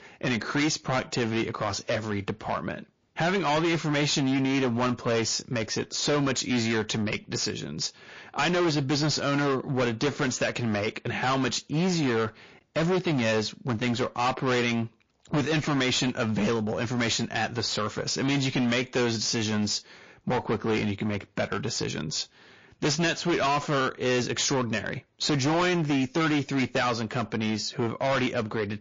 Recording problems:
distortion; heavy; 18% of the sound clipped
garbled, watery; slightly

